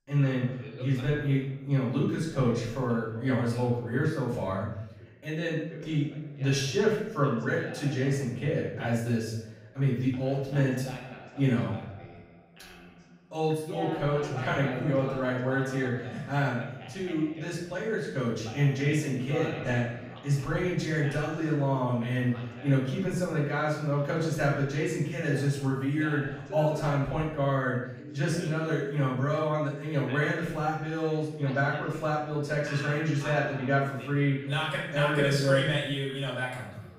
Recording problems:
off-mic speech; far
room echo; noticeable; dies away in 0.7 s
voice in the background; noticeable; throughout; 15 dB below the speech

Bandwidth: 15.5 kHz